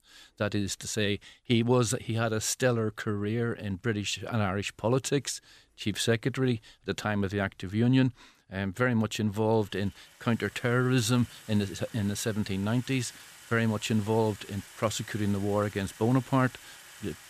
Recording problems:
household noises; noticeable; throughout; 20 dB below the speech

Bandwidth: 14.5 kHz